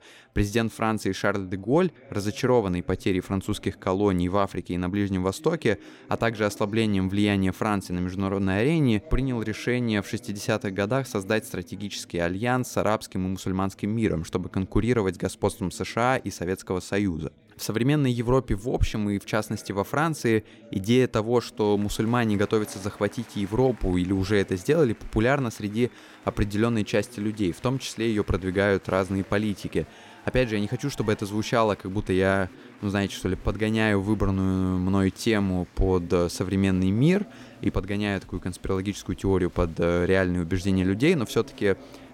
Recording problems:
chatter from many people; faint; throughout; 25 dB below the speech

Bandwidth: 16.5 kHz